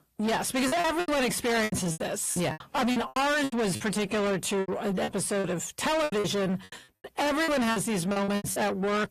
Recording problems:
distortion; heavy; 6 dB below the speech
garbled, watery; slightly; nothing above 14.5 kHz
choppy; very; 15% of the speech affected

